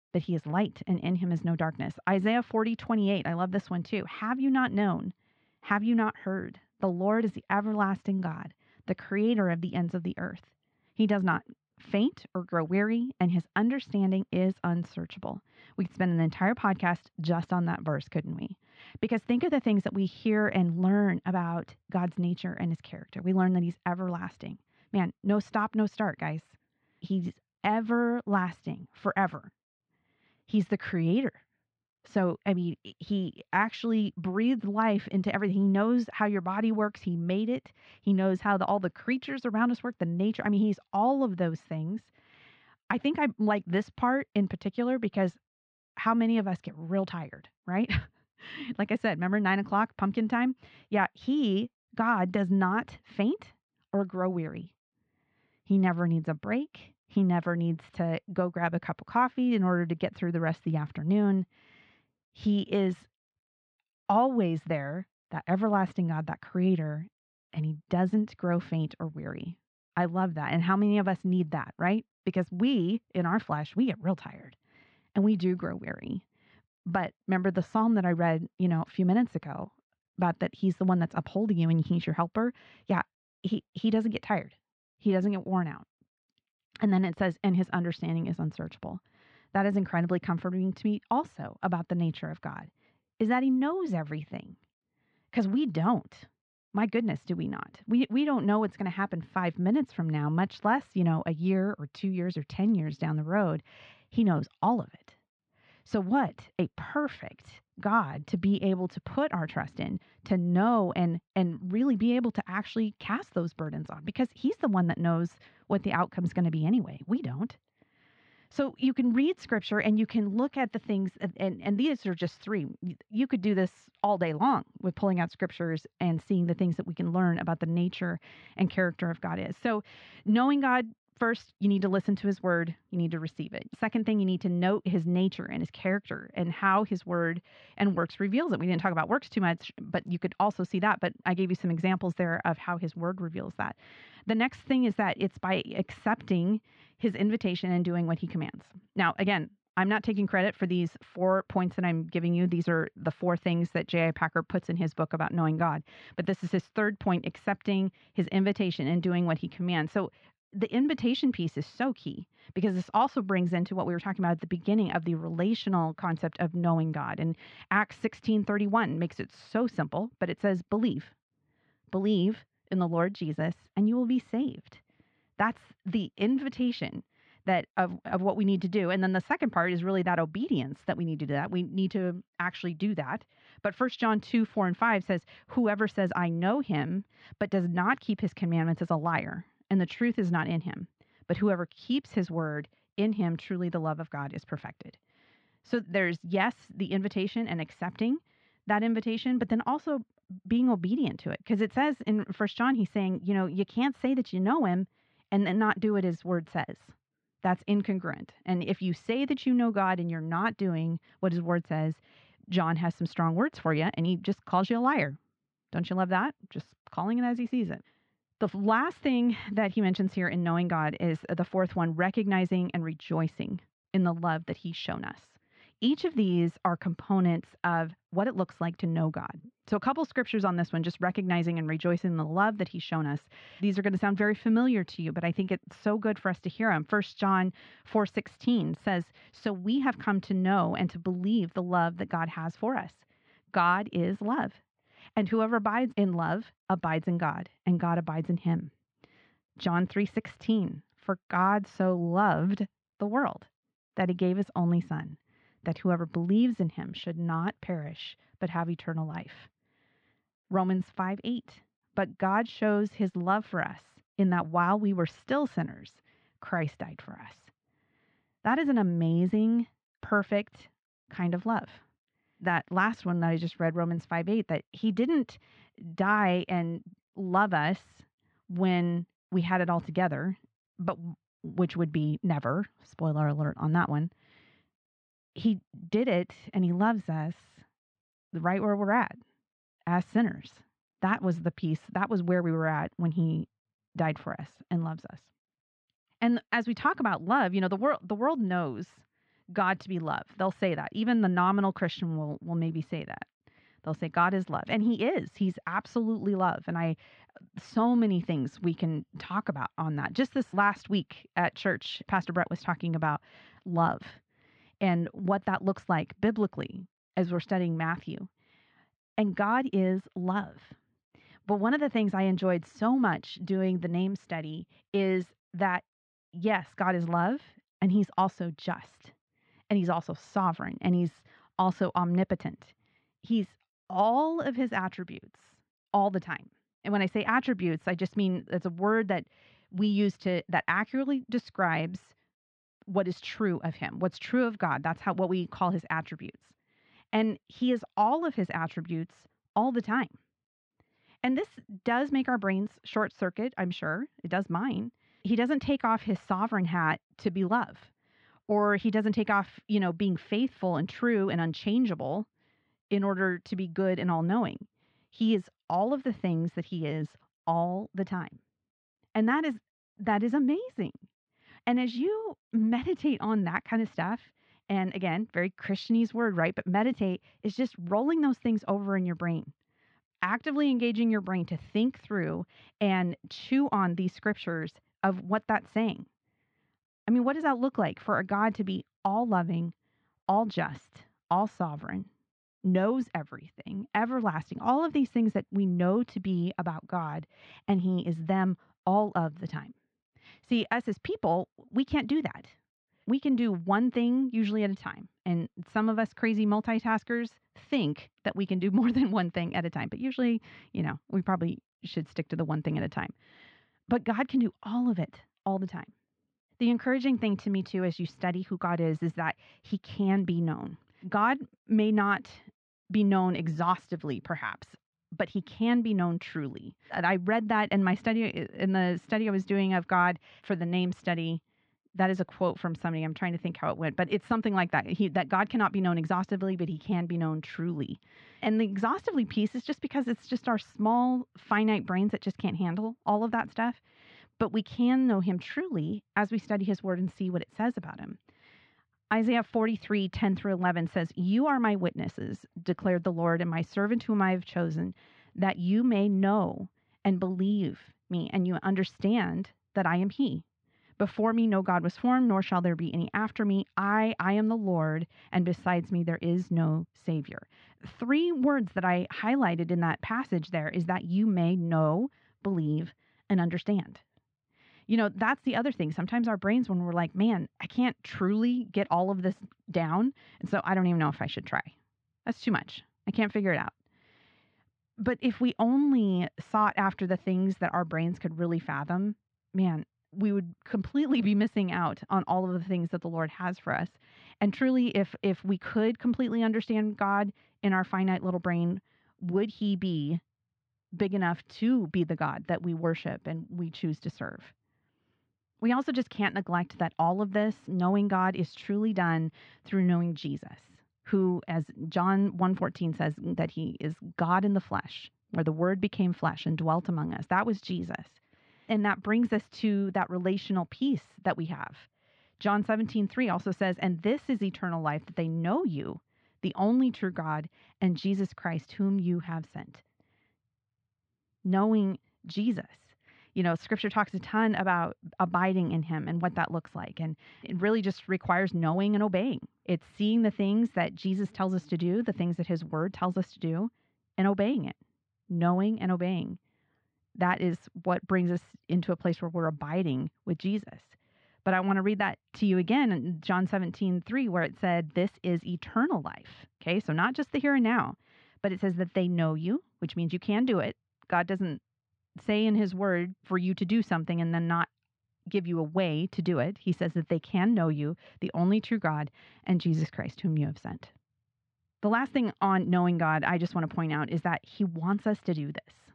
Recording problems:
muffled; slightly; fading above 4 kHz

